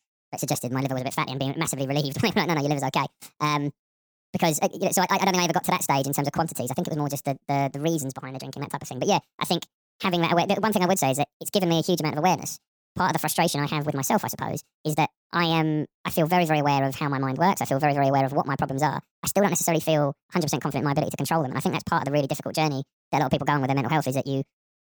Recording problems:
wrong speed and pitch; too fast and too high; 1.6 times normal speed

